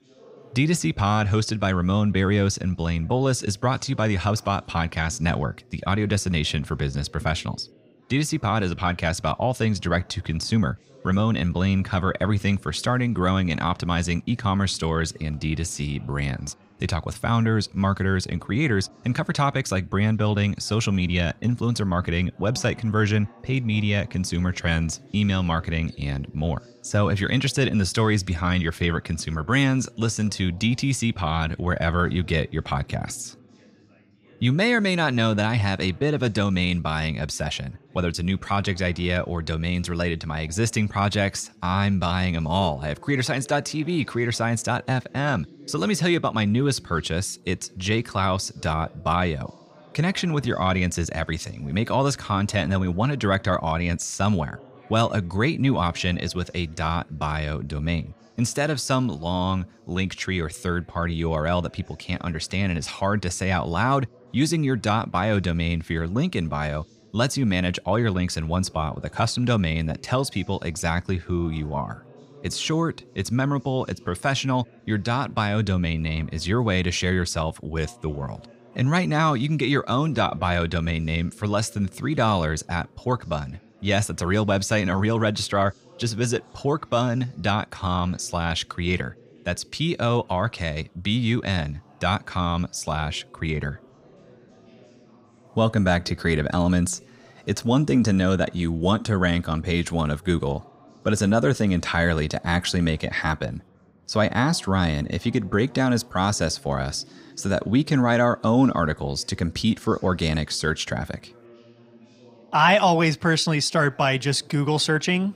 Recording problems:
background chatter; faint; throughout; 4 voices, 25 dB below the speech

